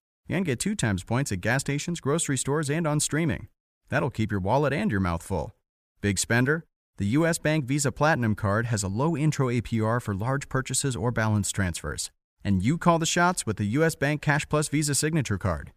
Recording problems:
none

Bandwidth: 15 kHz